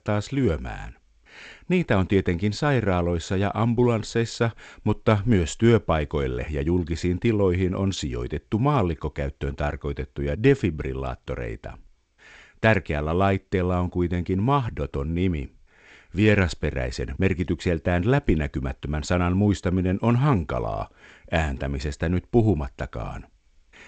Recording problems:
garbled, watery; slightly; nothing above 8 kHz

